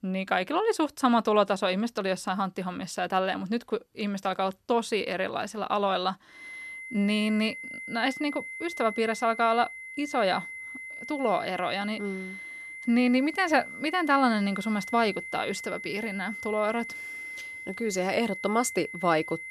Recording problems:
high-pitched whine; loud; from 6.5 s on; 2 kHz, 10 dB below the speech

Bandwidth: 13.5 kHz